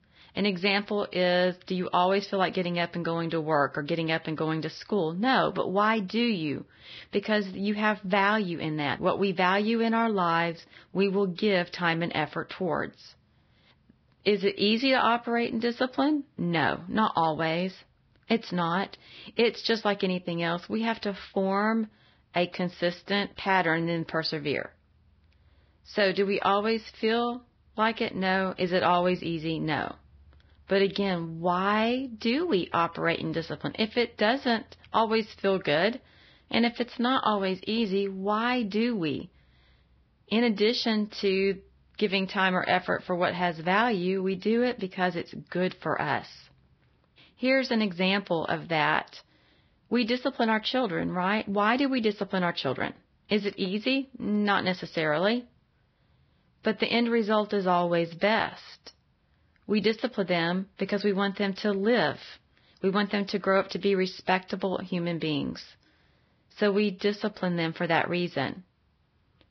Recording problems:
garbled, watery; badly; nothing above 5 kHz

